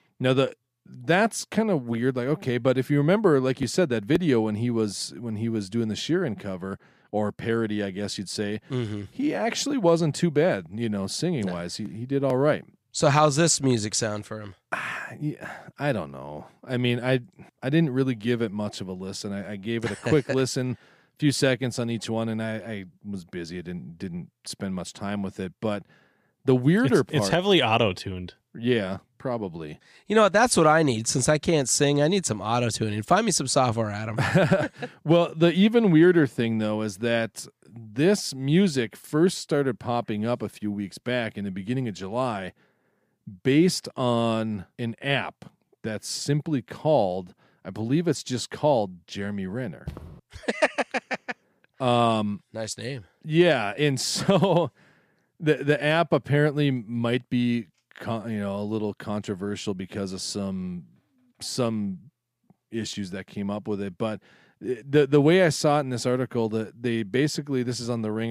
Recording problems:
footsteps; faint; at 50 s; peak 15 dB below the speech
abrupt cut into speech; at the end

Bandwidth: 15 kHz